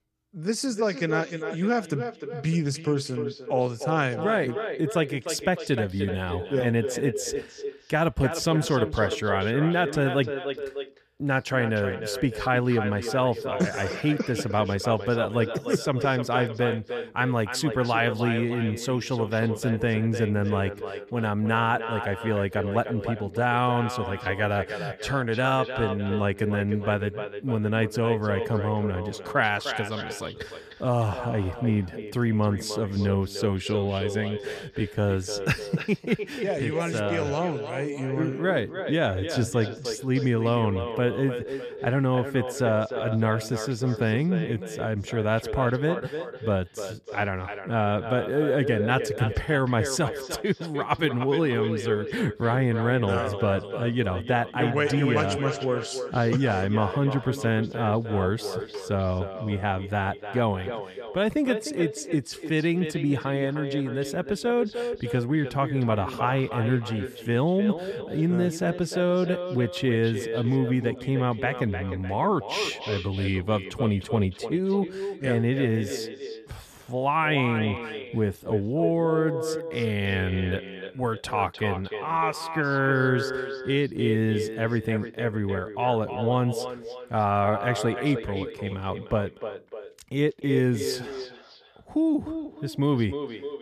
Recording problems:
echo of what is said; strong; throughout; 300 ms later, 8 dB below the speech

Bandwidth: 14.5 kHz